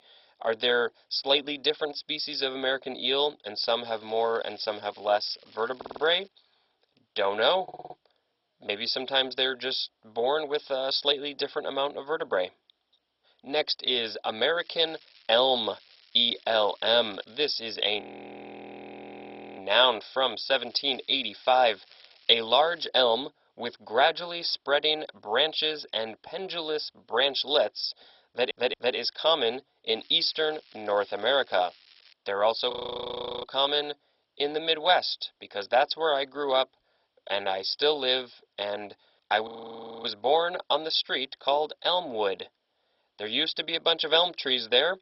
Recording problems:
garbled, watery; badly; nothing above 5.5 kHz
thin; very; fading below 550 Hz
crackling; faint; 4 times, first at 4 s; 30 dB below the speech
audio stuttering; at 6 s, at 7.5 s and at 28 s
audio freezing; at 18 s for 1.5 s, at 33 s for 0.5 s and at 39 s for 0.5 s

